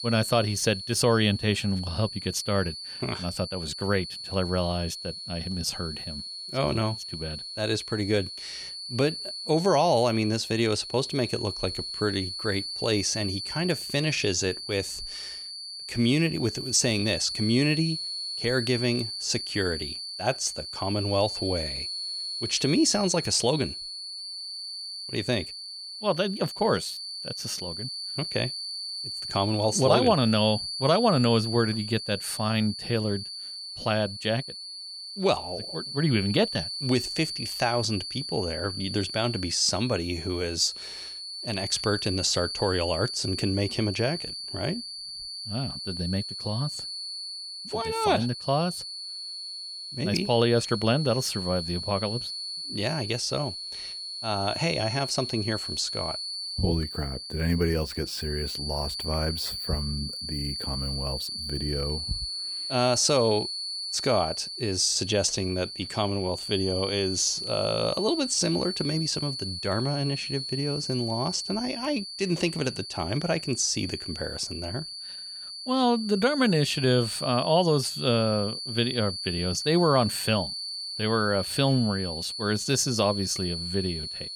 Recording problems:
high-pitched whine; loud; throughout; 4.5 kHz, 6 dB below the speech

